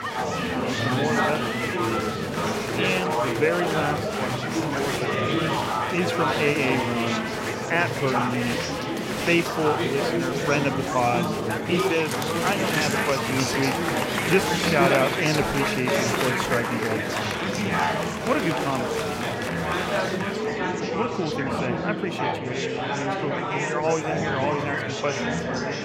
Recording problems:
murmuring crowd; very loud; throughout; 2 dB above the speech

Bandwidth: 16 kHz